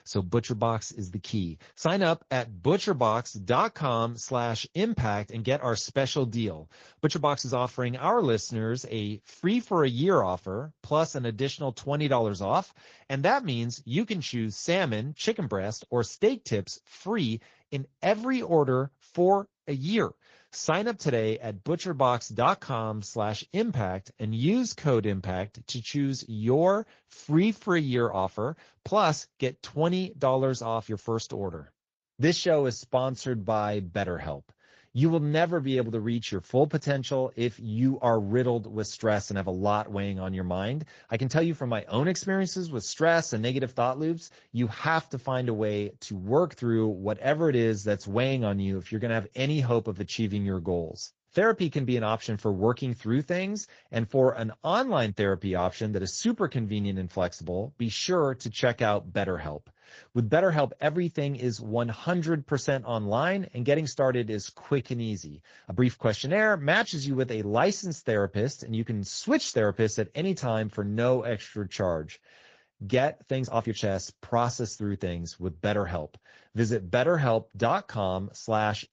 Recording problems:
garbled, watery; slightly; nothing above 7 kHz
uneven, jittery; strongly; from 1.5 s to 1:14

